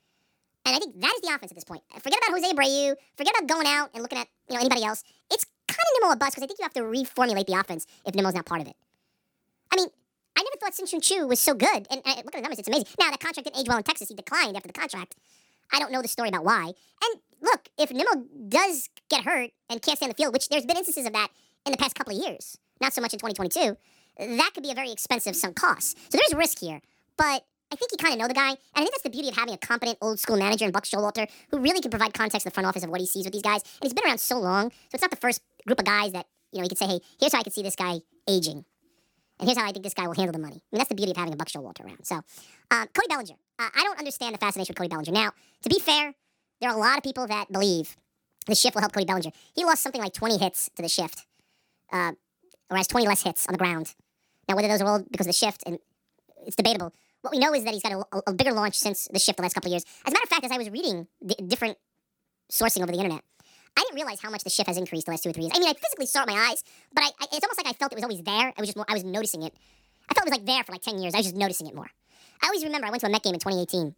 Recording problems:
wrong speed and pitch; too fast and too high; 1.5 times normal speed

